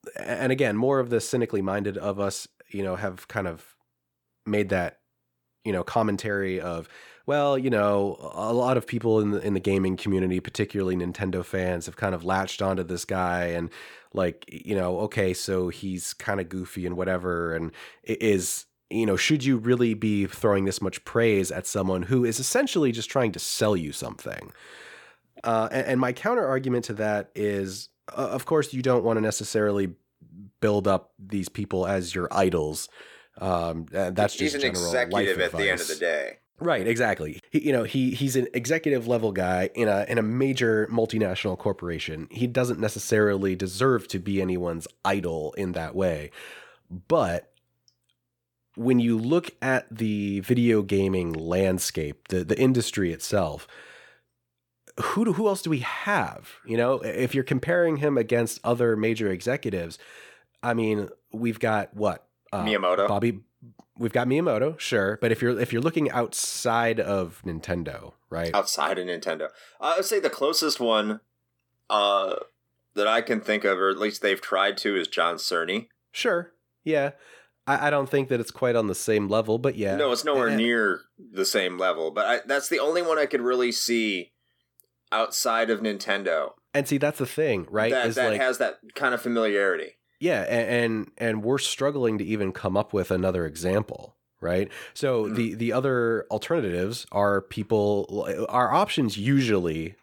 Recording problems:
none

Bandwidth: 18.5 kHz